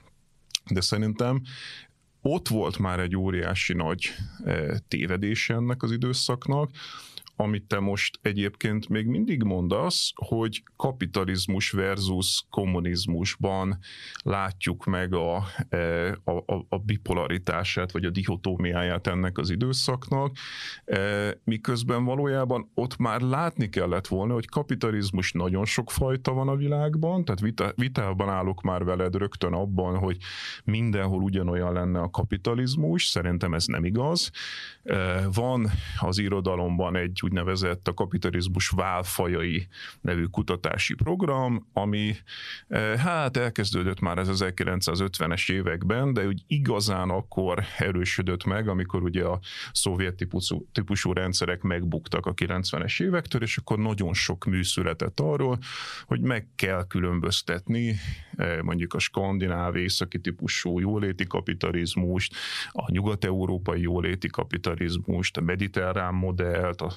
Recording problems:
squashed, flat; somewhat

